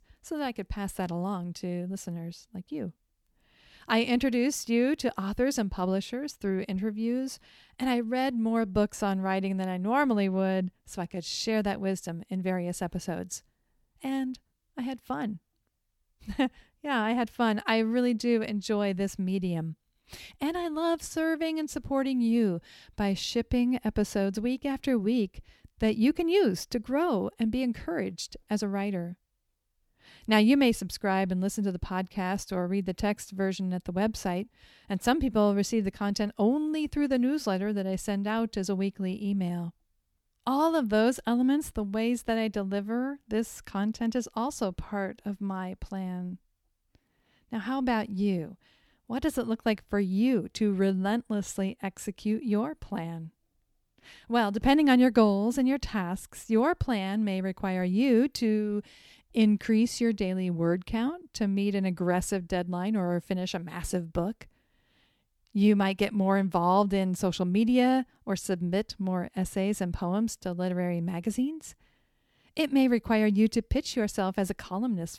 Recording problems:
none

